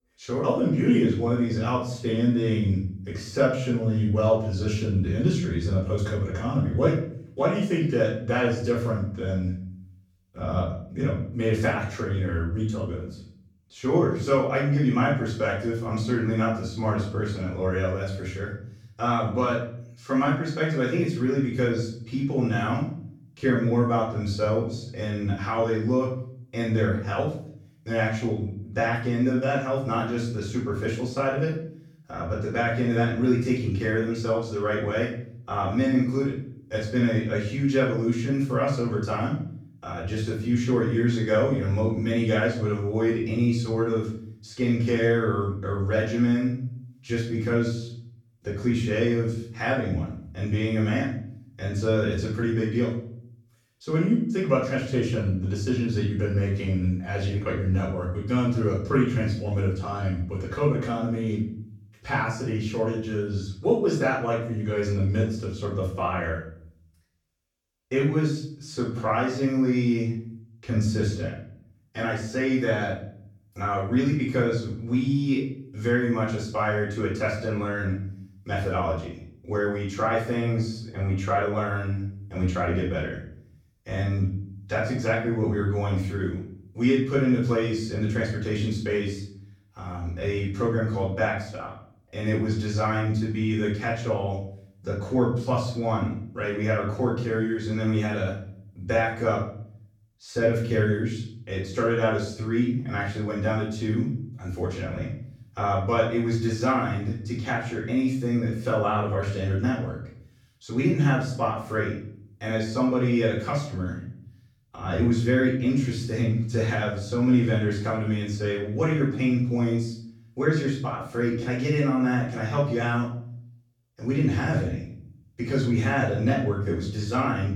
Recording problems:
off-mic speech; far
room echo; noticeable; dies away in 0.5 s

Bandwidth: 18.5 kHz